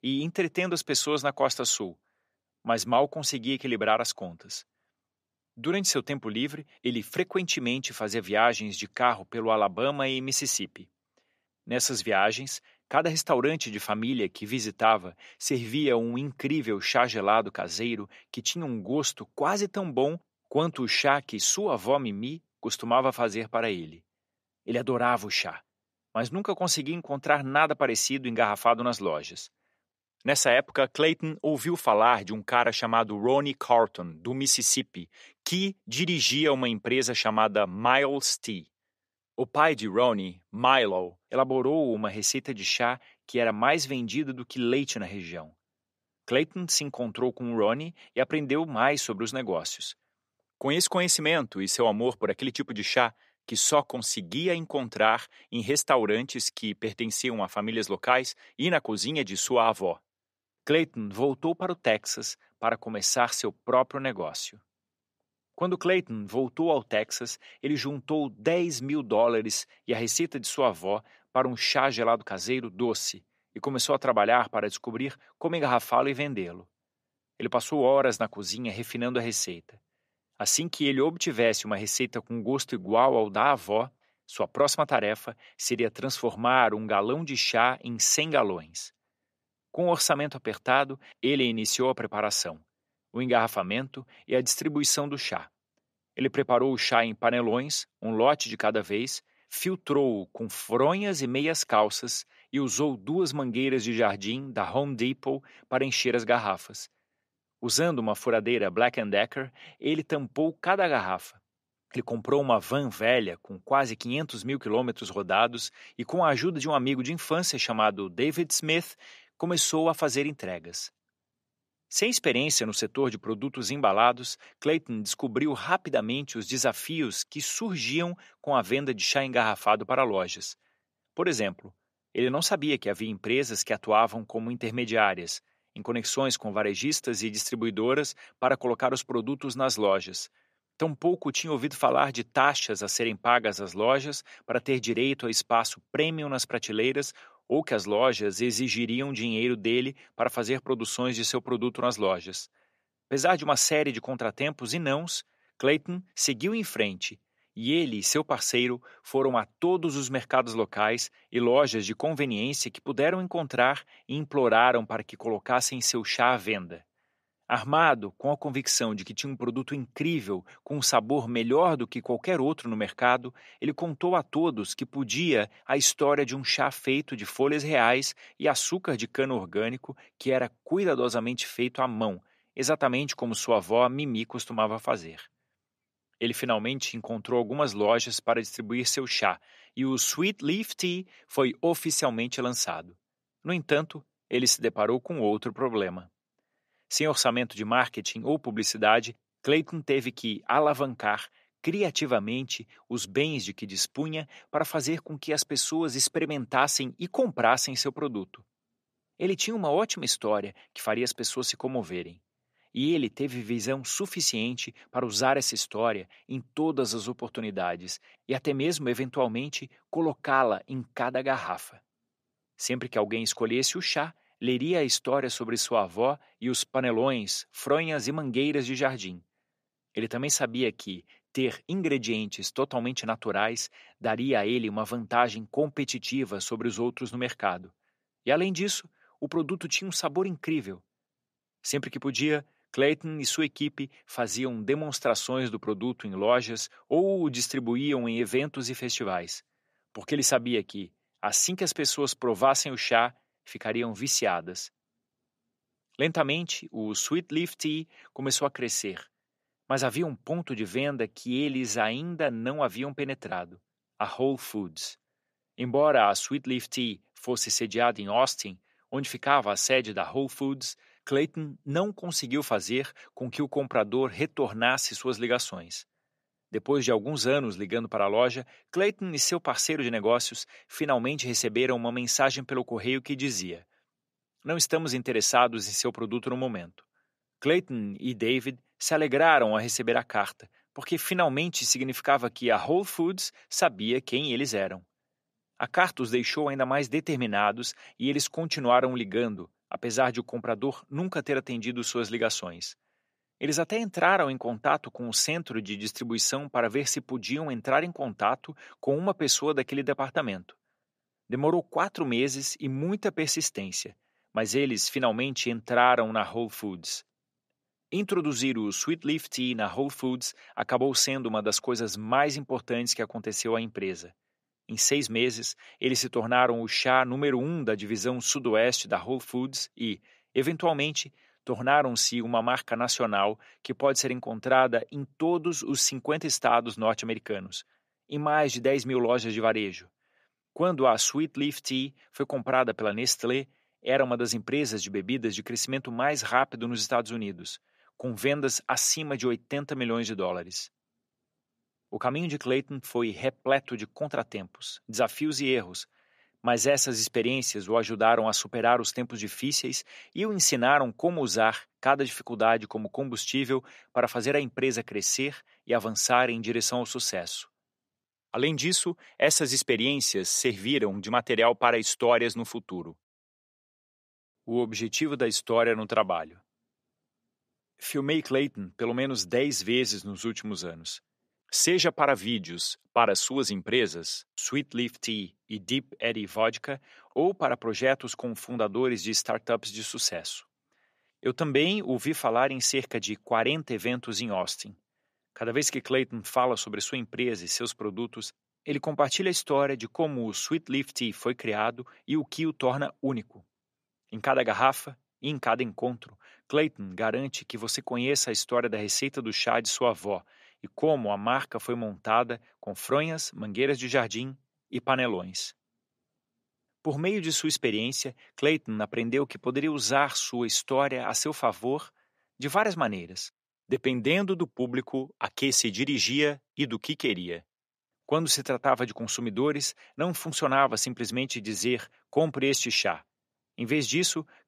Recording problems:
thin; very slightly; fading below 450 Hz

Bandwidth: 14.5 kHz